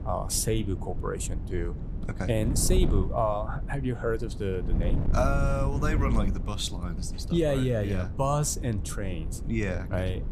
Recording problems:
wind noise on the microphone; occasional gusts; 15 dB below the speech

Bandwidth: 14.5 kHz